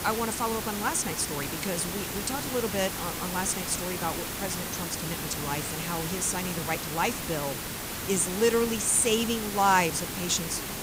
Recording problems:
hiss; loud; throughout; 4 dB below the speech

